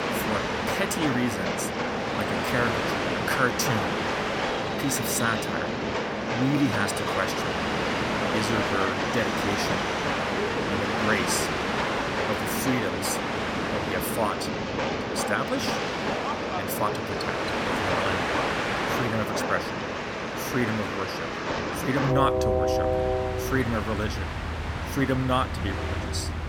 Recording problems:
train or aircraft noise; very loud; throughout; 2 dB above the speech

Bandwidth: 17 kHz